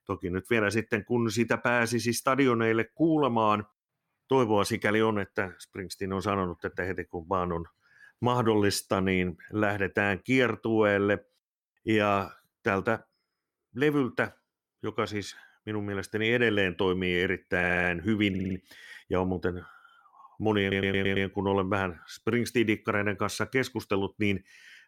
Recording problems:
audio stuttering; at 18 s and at 21 s

